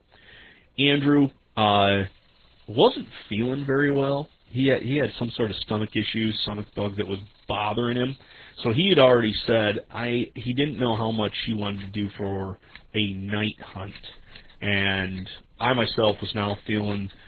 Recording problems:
garbled, watery; badly; nothing above 3.5 kHz
household noises; faint; throughout; 30 dB below the speech

